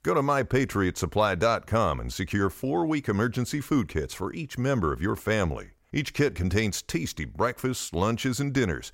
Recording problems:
none

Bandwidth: 16 kHz